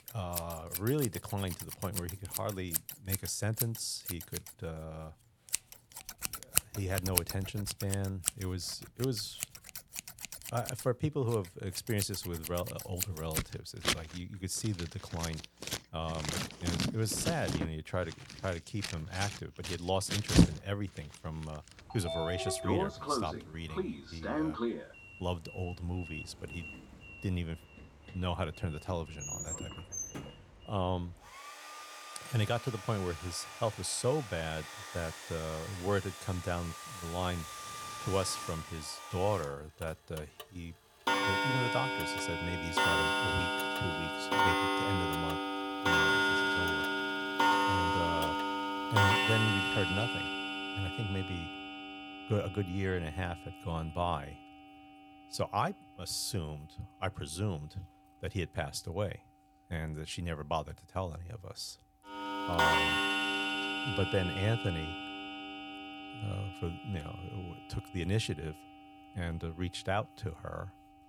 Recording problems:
household noises; very loud; throughout; 3 dB above the speech

